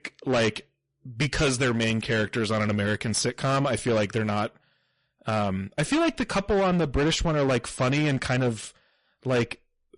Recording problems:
distortion; heavy; 14% of the sound clipped
garbled, watery; slightly; nothing above 10.5 kHz

